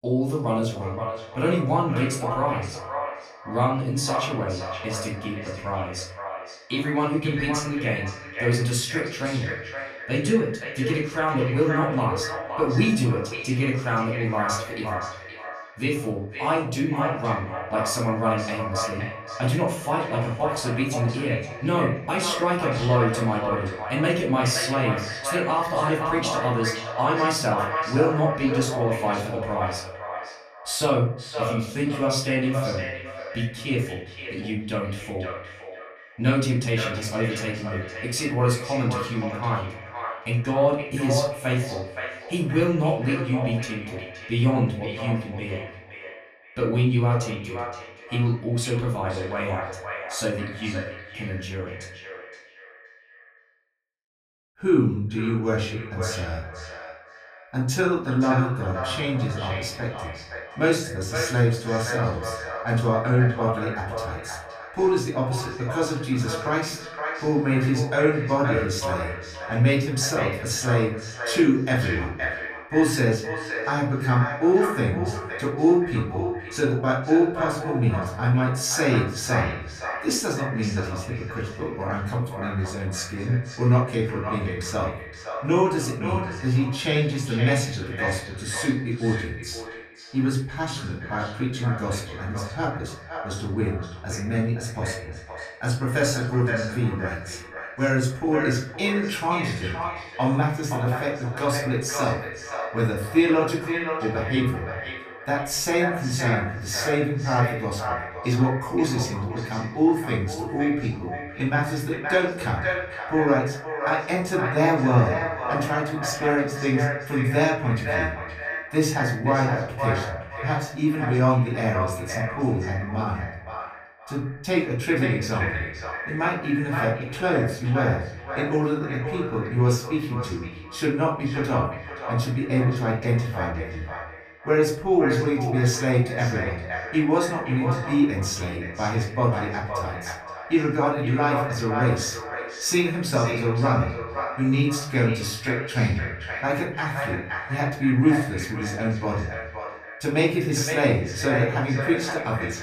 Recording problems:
echo of what is said; strong; throughout; 520 ms later, 8 dB below the speech
off-mic speech; far
room echo; slight; dies away in 0.5 s

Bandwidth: 14.5 kHz